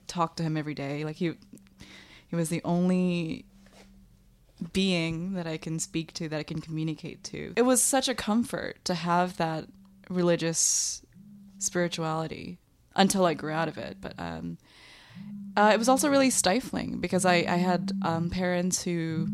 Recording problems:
alarms or sirens; noticeable; throughout; 15 dB below the speech

